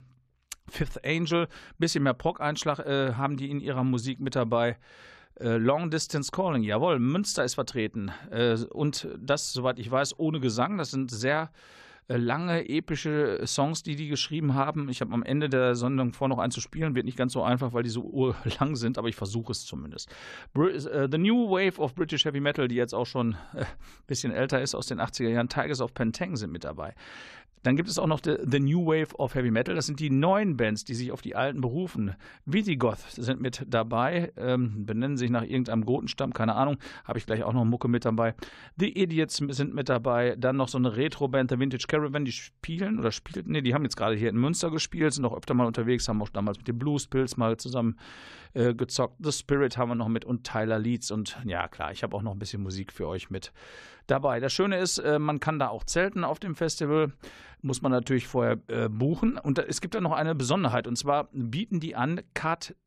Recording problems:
none

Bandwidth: 14.5 kHz